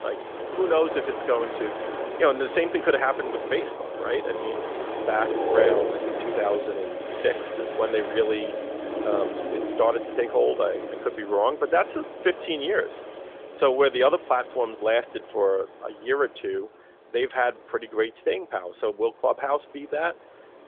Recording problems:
phone-call audio; nothing above 3.5 kHz
wind in the background; loud; throughout; 5 dB below the speech

